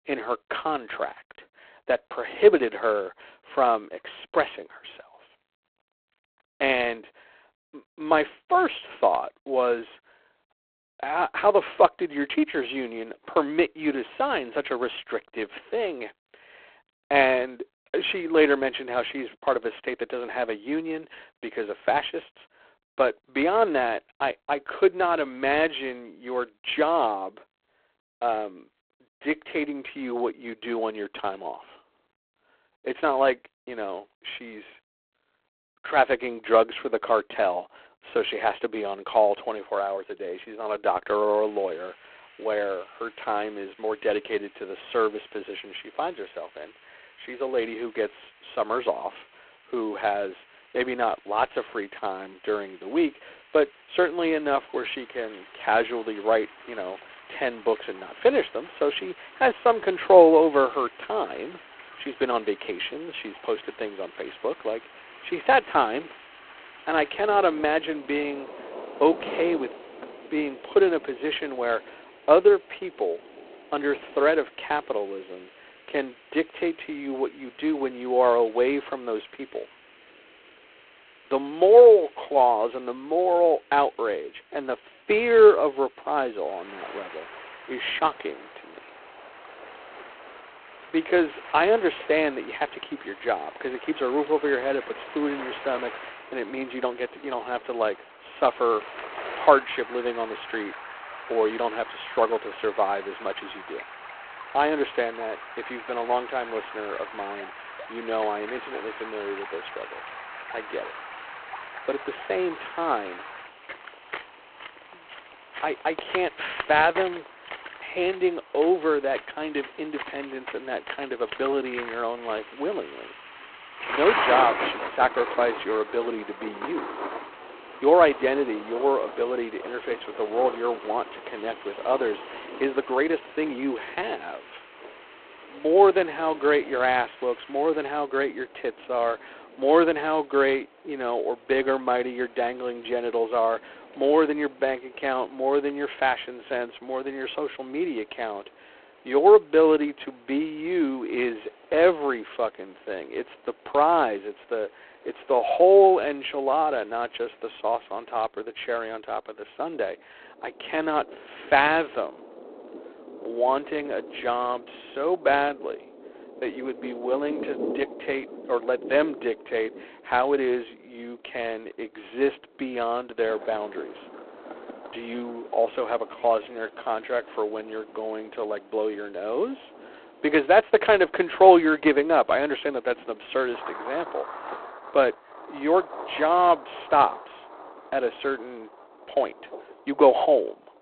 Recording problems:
phone-call audio; poor line
rain or running water; noticeable; from 55 s on; 15 dB below the speech
hiss; faint; from 41 s to 2:18; 30 dB below the speech
uneven, jittery; strongly; from 2:13 to 2:57

